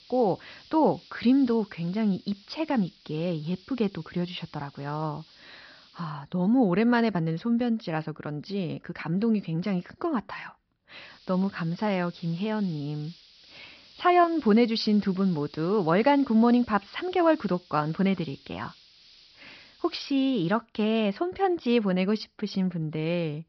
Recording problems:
high frequencies cut off; noticeable; nothing above 5.5 kHz
hiss; faint; until 6 s and from 11 to 21 s; 25 dB below the speech

